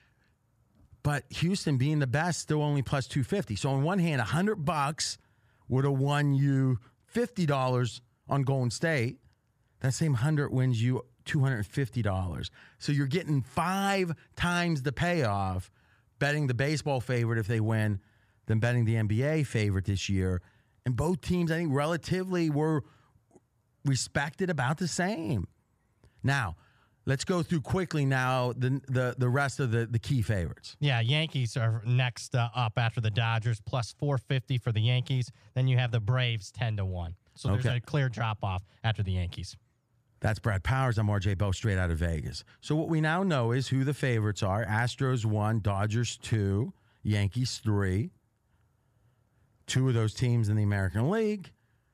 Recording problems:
none

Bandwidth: 14.5 kHz